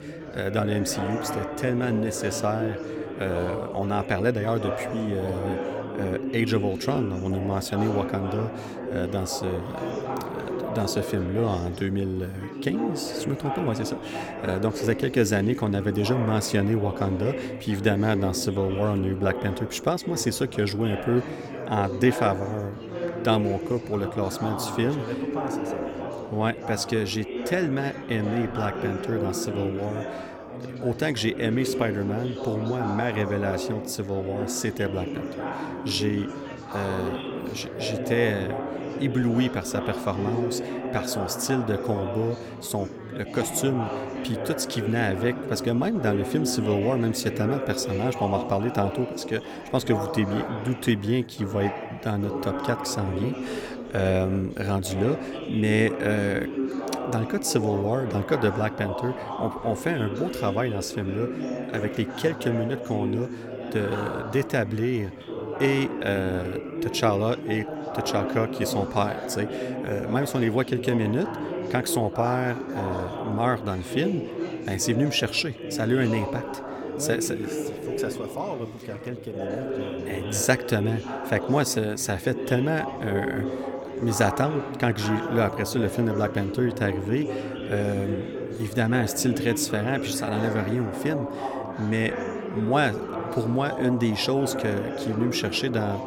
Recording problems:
chatter from many people; loud; throughout; 5 dB below the speech

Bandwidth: 17 kHz